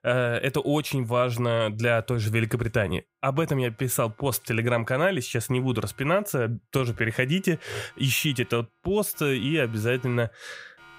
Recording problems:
alarms or sirens; faint; throughout; 30 dB below the speech

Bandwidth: 15.5 kHz